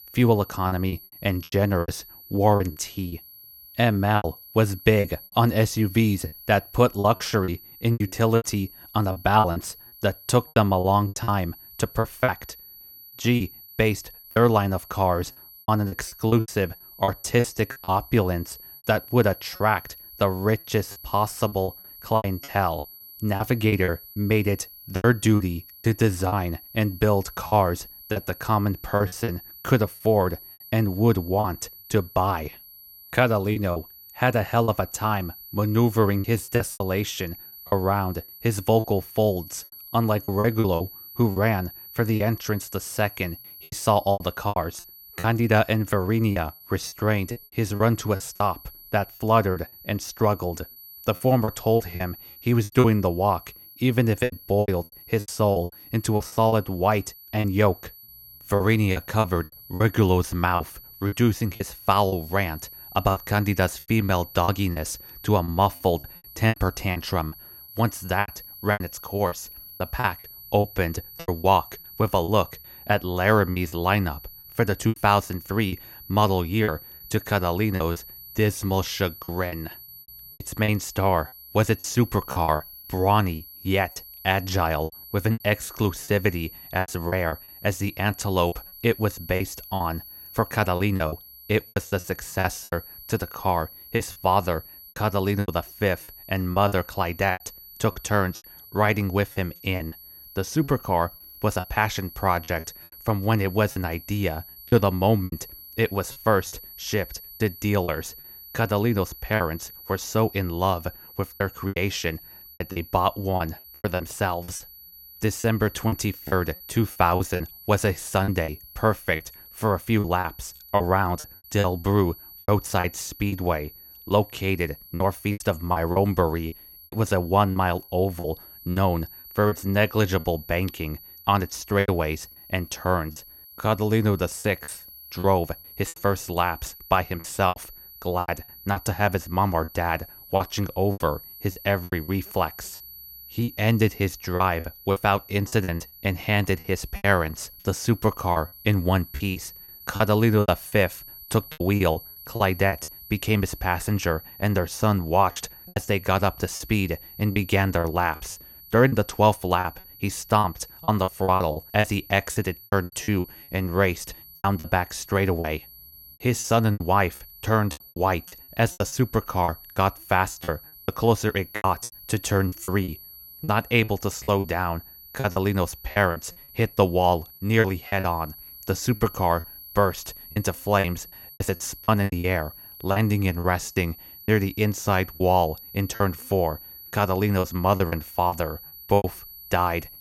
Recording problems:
high-pitched whine; noticeable; throughout; 12 kHz, 15 dB below the speech
choppy; very; 11% of the speech affected

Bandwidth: 17 kHz